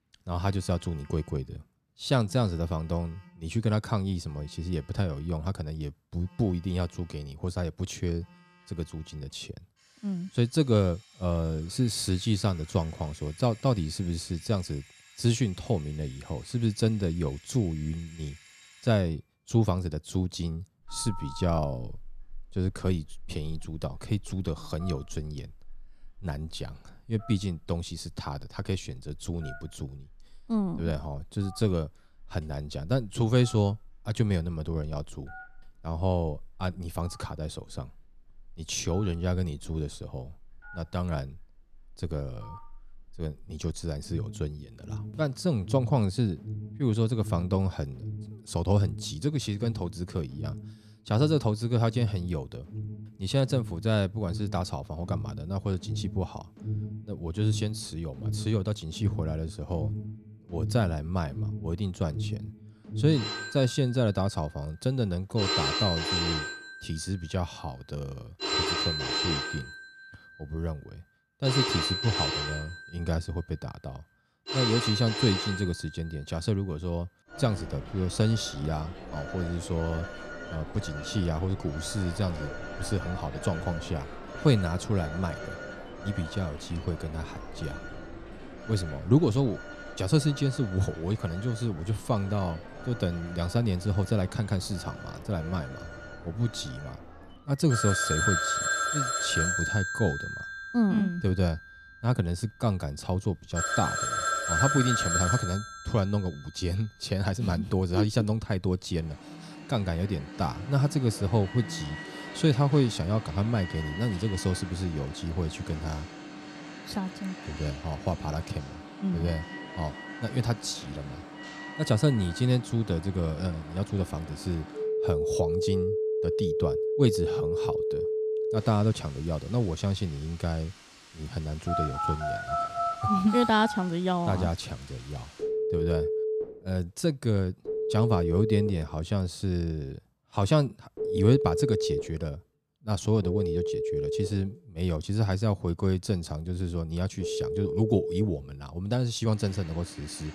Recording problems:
alarms or sirens; loud; throughout; 4 dB below the speech

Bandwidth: 14 kHz